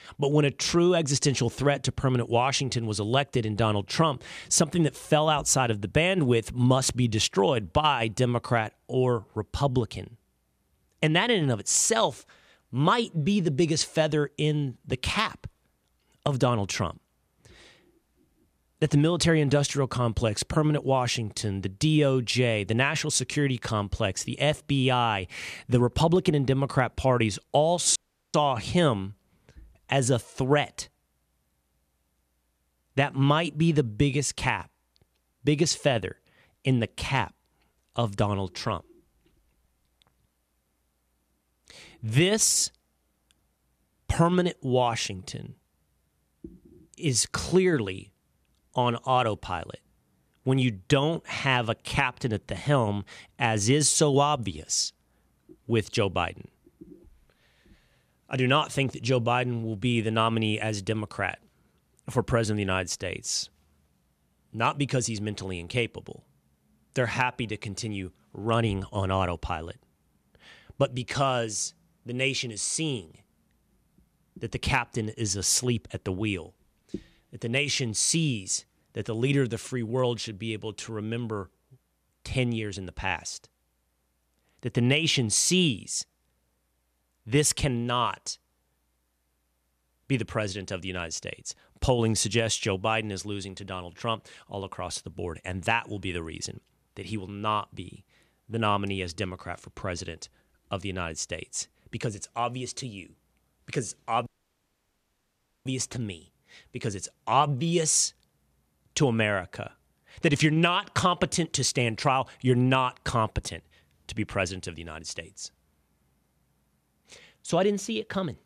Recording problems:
audio cutting out; at 28 s and at 1:44 for 1.5 s

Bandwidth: 14.5 kHz